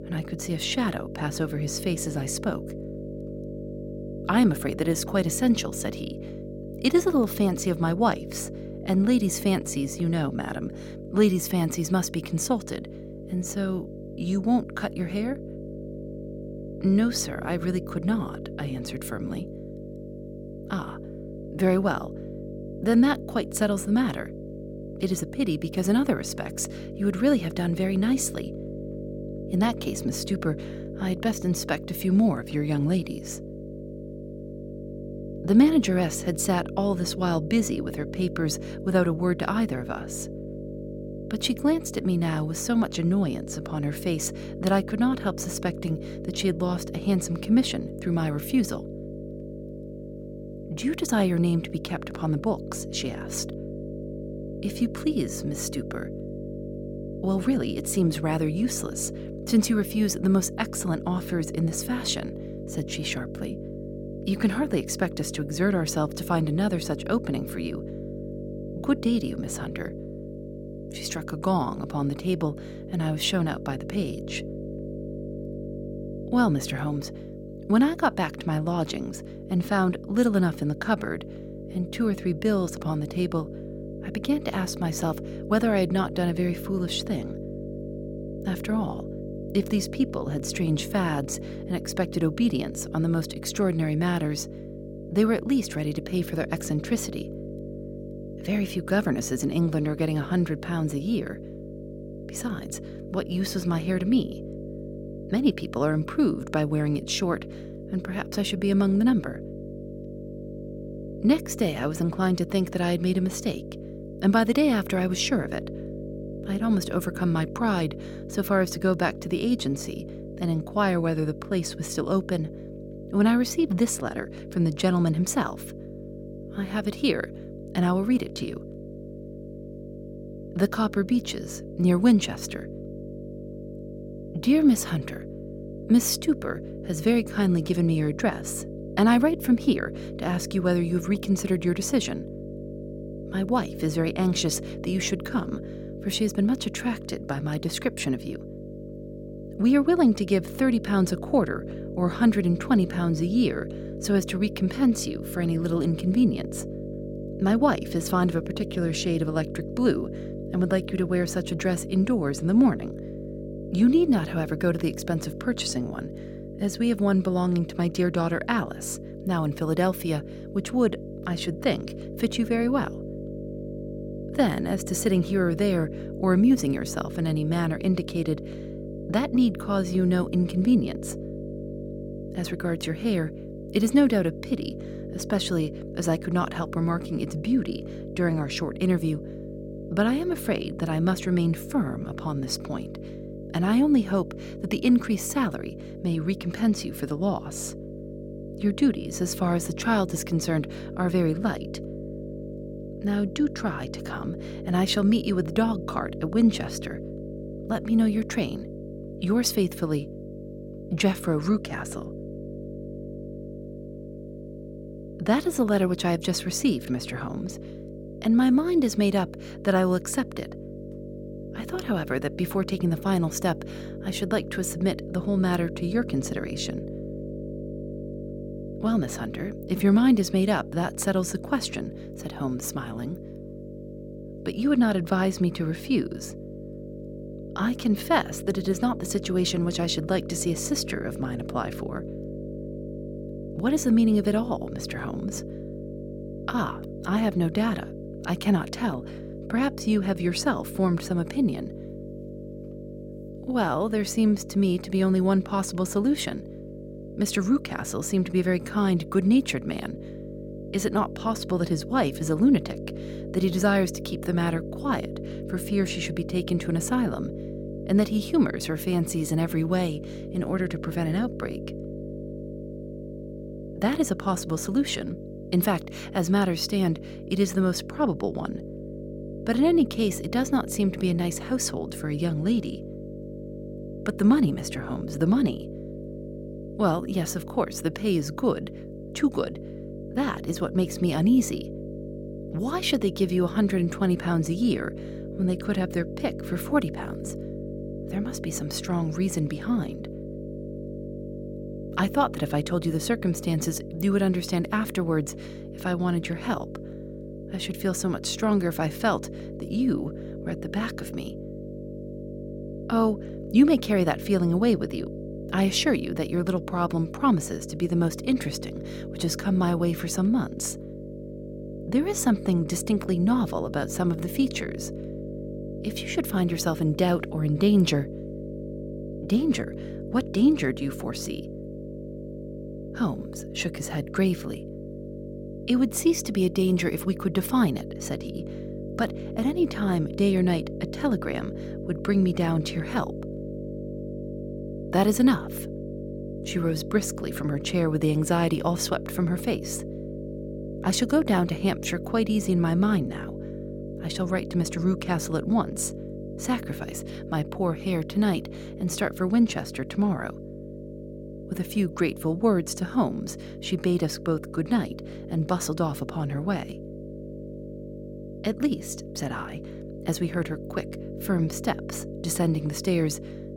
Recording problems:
electrical hum; noticeable; throughout; 50 Hz, 10 dB below the speech

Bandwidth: 16.5 kHz